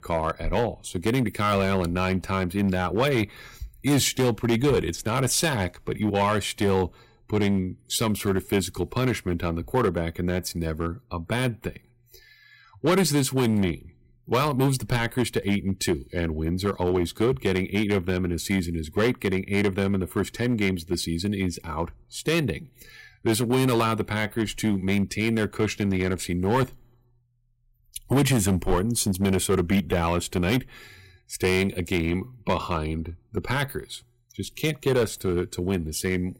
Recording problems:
distortion; slight; 5% of the sound clipped

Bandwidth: 16 kHz